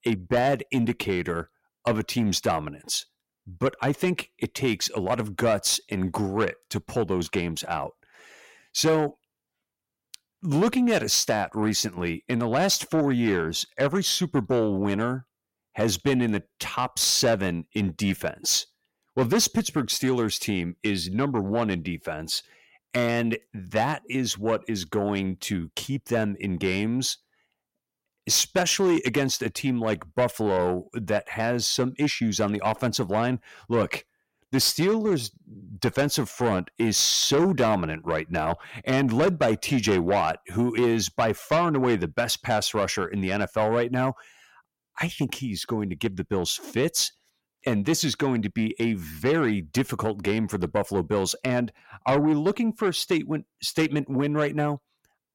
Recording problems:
distortion; slight; 10 dB below the speech

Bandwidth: 16.5 kHz